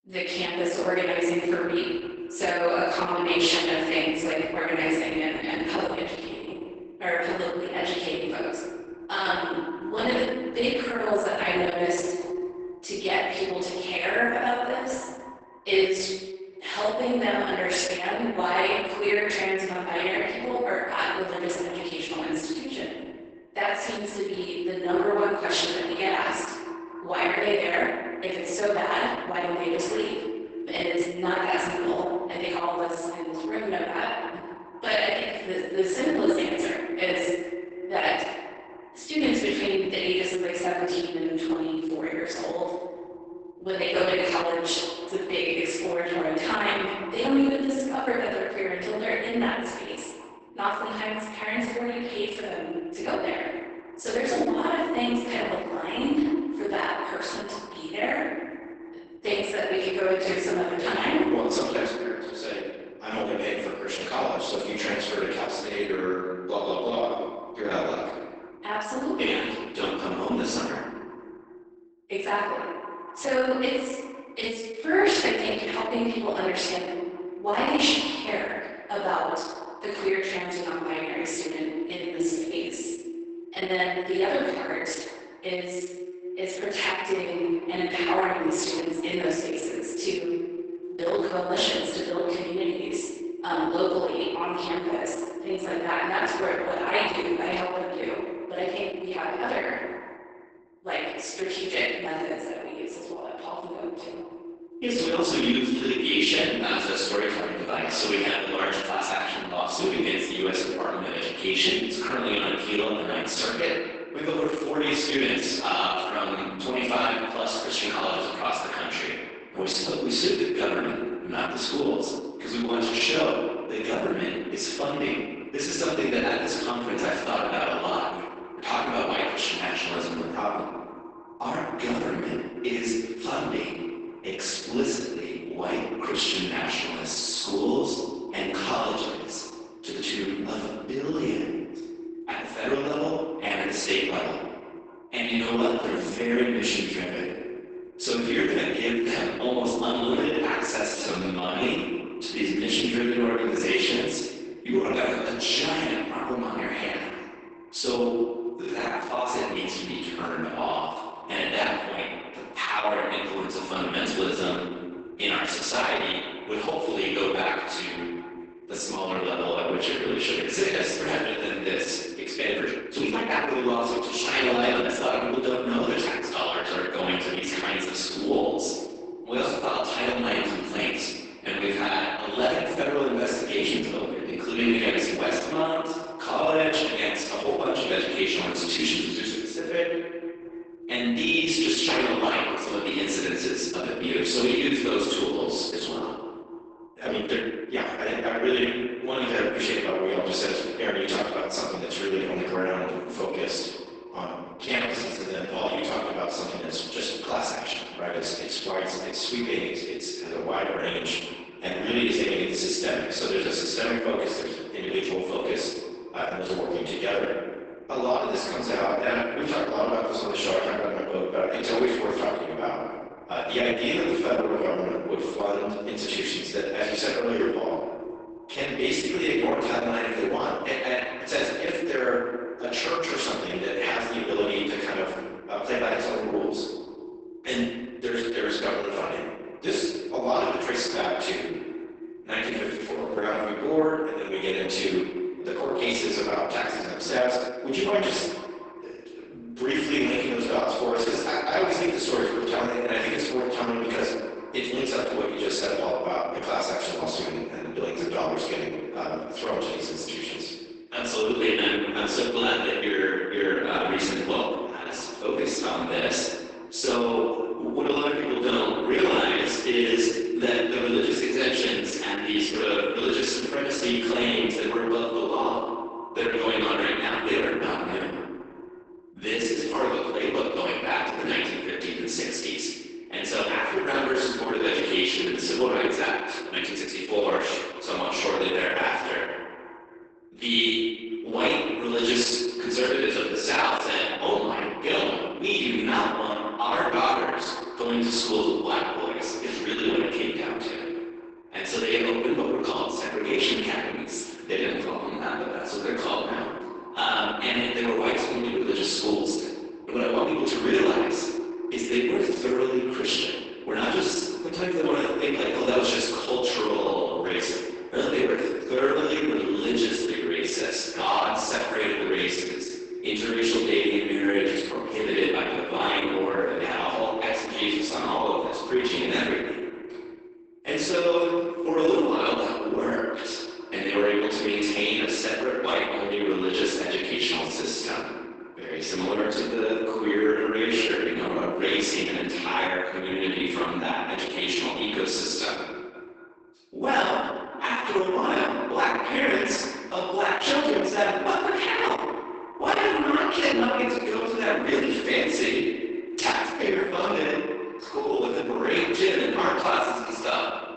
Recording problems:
echo of what is said; strong; throughout; 240 ms later, 10 dB below the speech
room echo; strong; dies away in 1.1 s
off-mic speech; far
garbled, watery; badly; nothing above 8 kHz
thin; very slightly; fading below 300 Hz
uneven, jittery; strongly; from 28 s to 5:59

